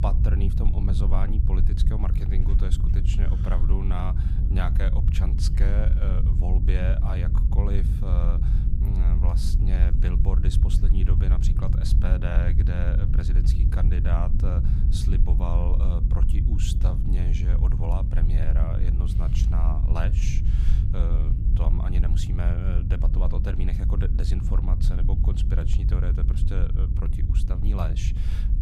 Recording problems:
low rumble; loud; throughout; 2 dB below the speech

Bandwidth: 14.5 kHz